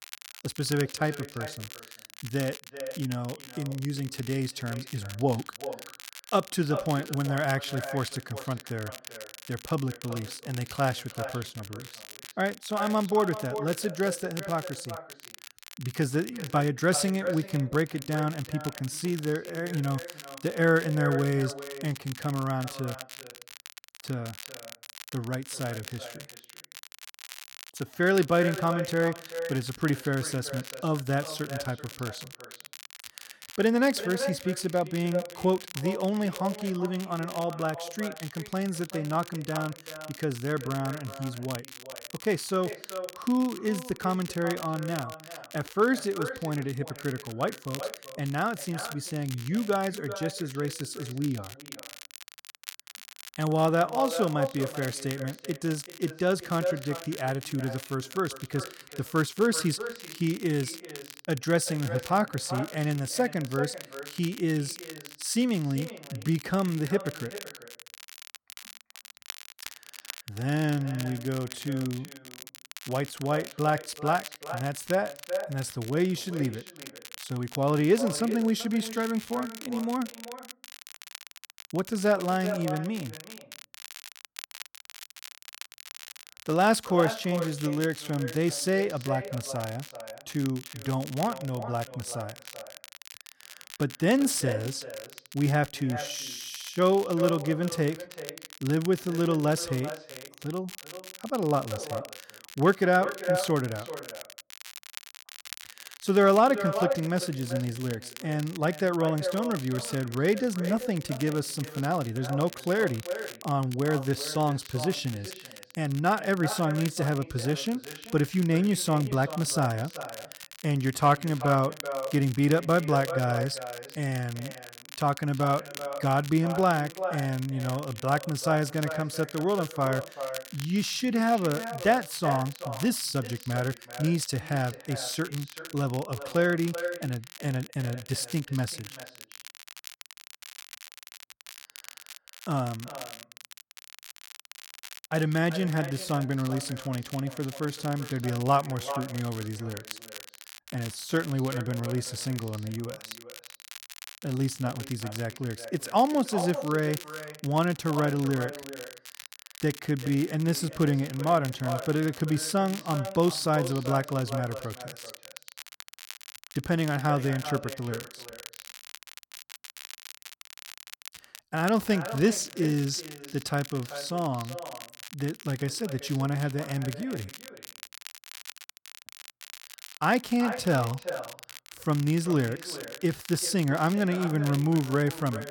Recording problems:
echo of what is said; strong; throughout; 380 ms later, 10 dB below the speech
crackle, like an old record; noticeable; 15 dB below the speech

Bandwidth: 17.5 kHz